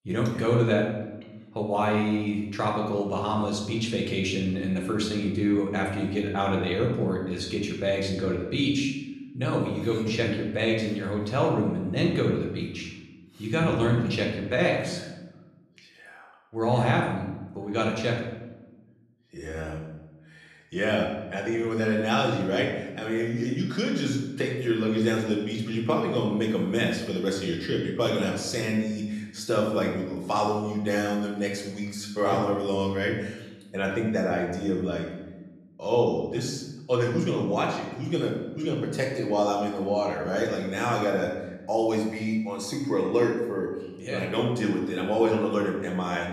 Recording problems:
room echo; noticeable; dies away in 0.9 s
off-mic speech; somewhat distant

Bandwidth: 13.5 kHz